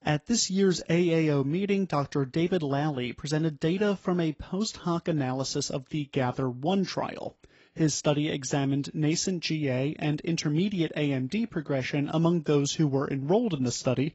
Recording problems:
garbled, watery; badly; nothing above 7.5 kHz

